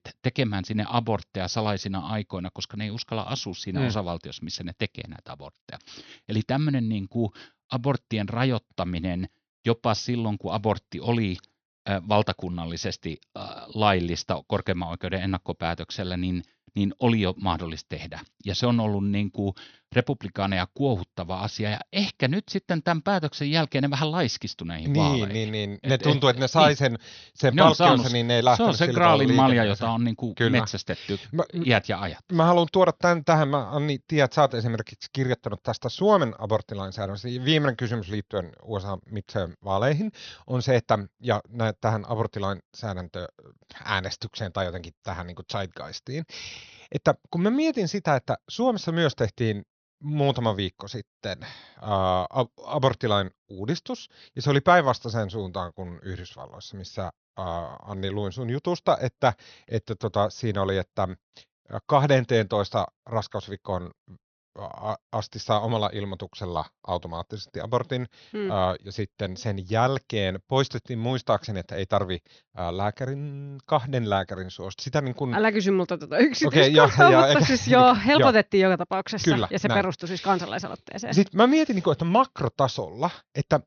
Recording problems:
high frequencies cut off; noticeable; nothing above 6 kHz

